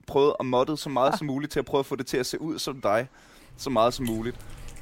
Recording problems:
animal sounds; noticeable; throughout; 20 dB below the speech

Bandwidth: 16 kHz